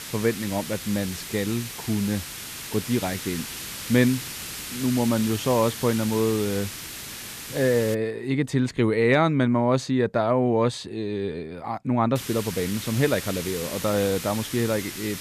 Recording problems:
hiss; loud; until 8 s and from 12 s on; 9 dB below the speech

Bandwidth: 14.5 kHz